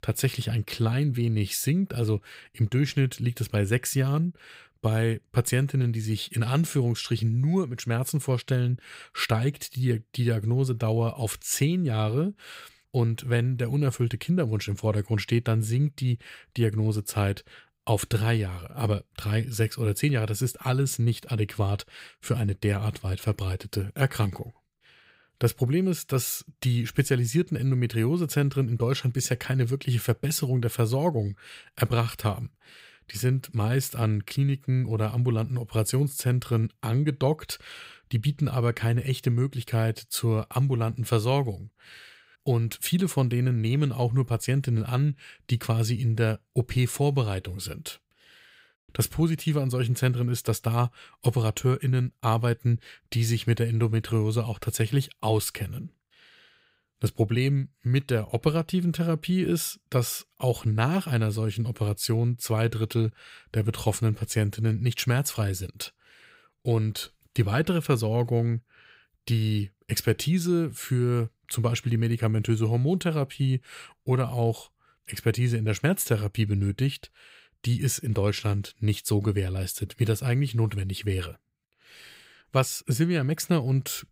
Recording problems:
none

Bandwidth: 15.5 kHz